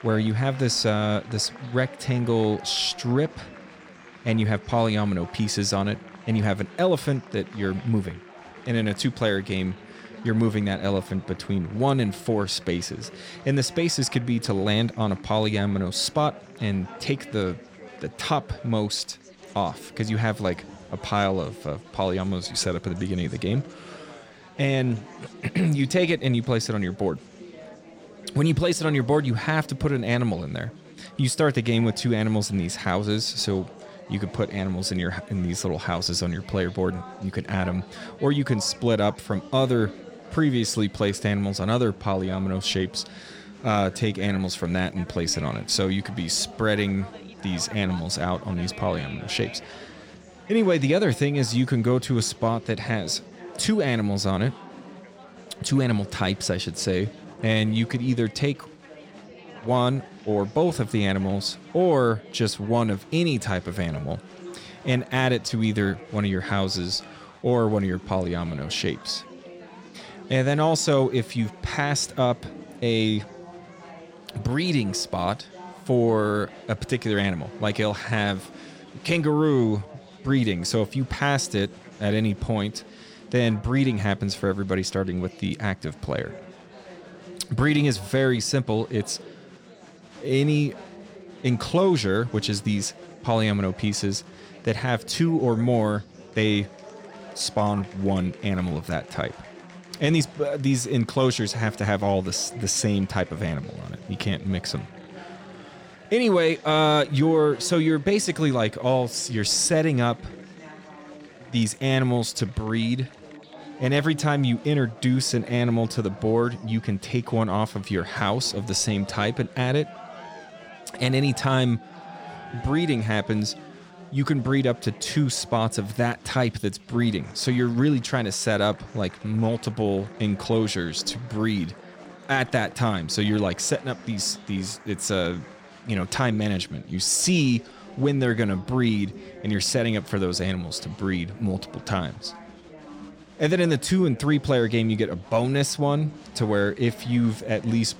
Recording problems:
chatter from many people; noticeable; throughout; 20 dB below the speech

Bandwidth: 16.5 kHz